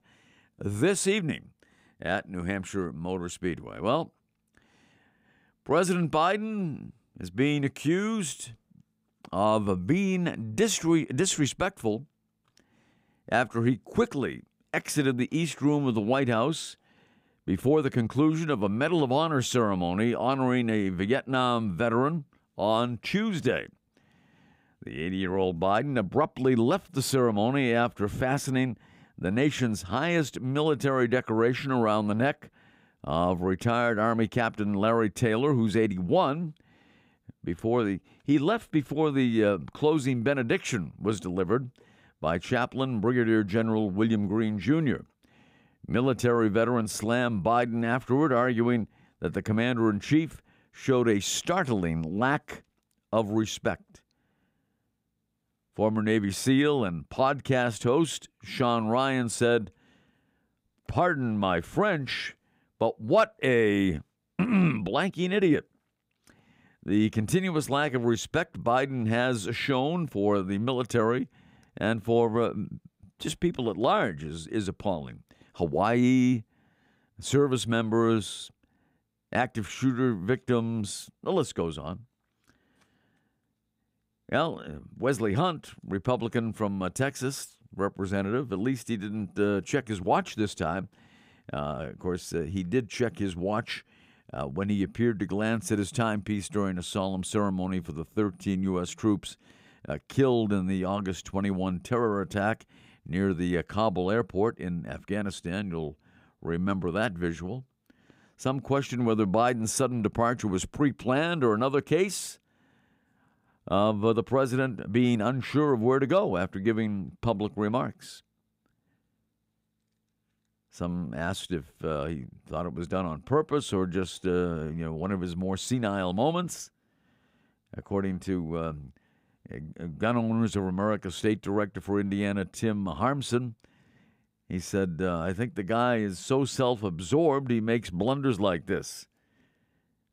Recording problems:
none

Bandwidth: 15.5 kHz